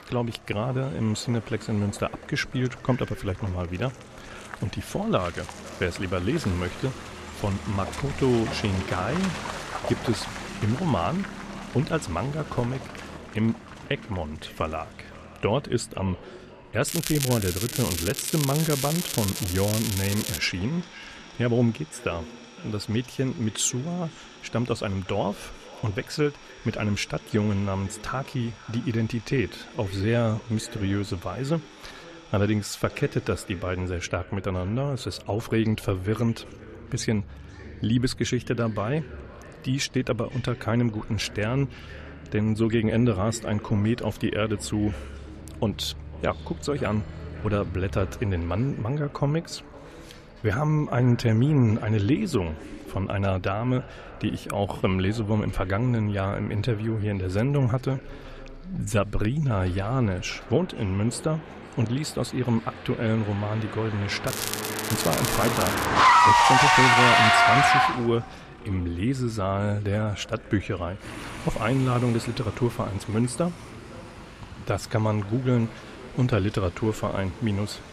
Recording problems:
echo of what is said; faint; throughout; 510 ms later, 20 dB below the speech
traffic noise; very loud; throughout; 2 dB above the speech
crackling; loud; from 17 to 20 s and from 1:04 to 1:06; 3 dB below the speech

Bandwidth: 14 kHz